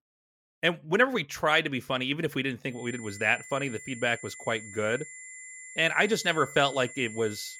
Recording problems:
high-pitched whine; noticeable; from 3 s on; 2 kHz, 15 dB below the speech

